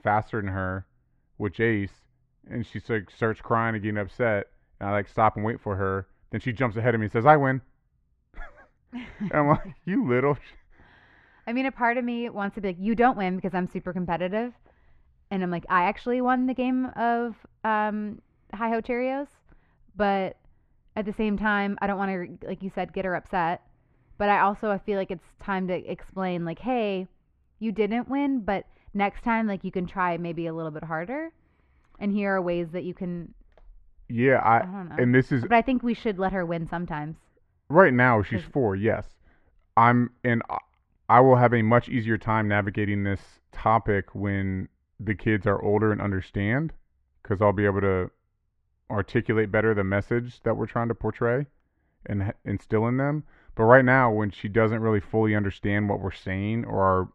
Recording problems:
muffled; very; fading above 1.5 kHz

